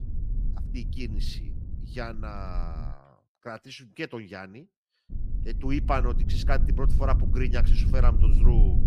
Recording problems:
low rumble; loud; until 3 s and from 5 s on; 10 dB below the speech

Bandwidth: 15 kHz